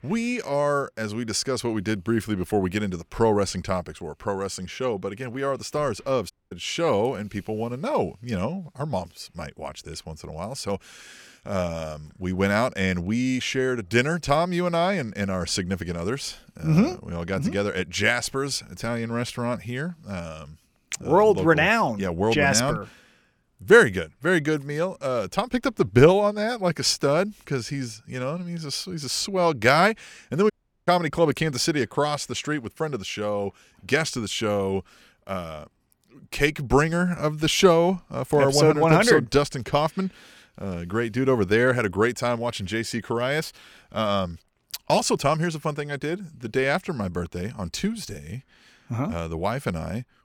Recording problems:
audio cutting out; at 6.5 s and at 31 s

